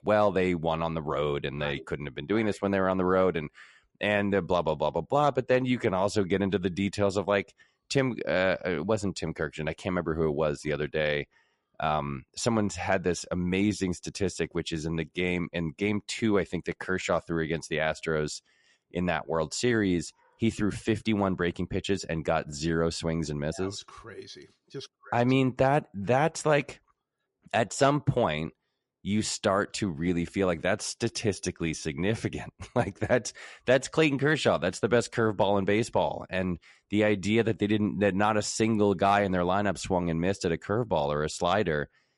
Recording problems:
garbled, watery; slightly; nothing above 11 kHz

